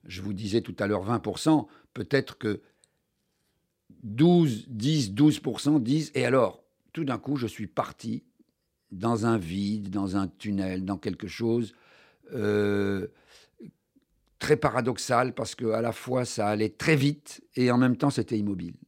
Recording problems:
none

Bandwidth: 16 kHz